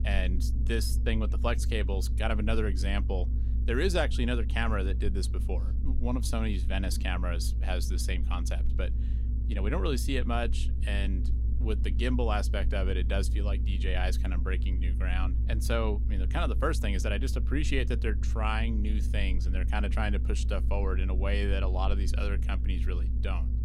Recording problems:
low rumble; noticeable; throughout; 15 dB below the speech

